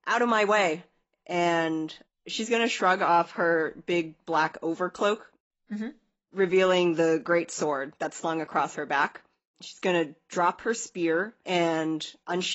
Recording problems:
garbled, watery; badly; nothing above 7.5 kHz
abrupt cut into speech; at the end

